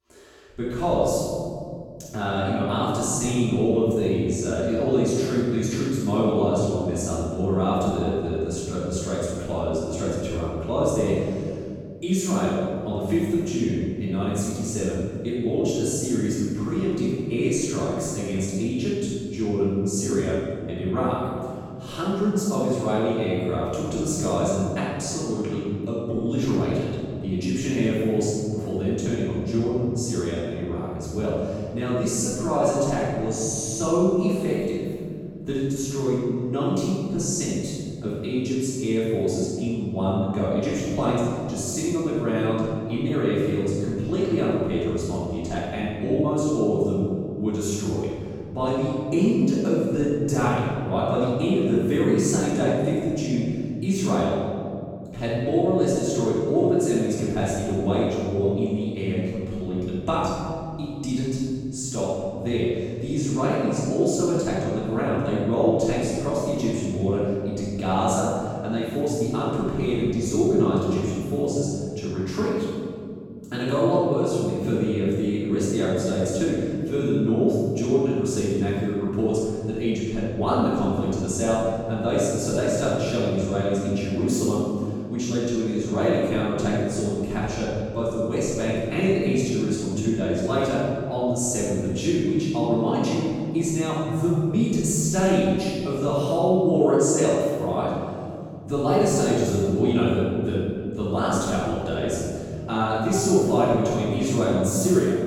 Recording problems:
room echo; strong; dies away in 2.5 s
off-mic speech; far

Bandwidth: 18 kHz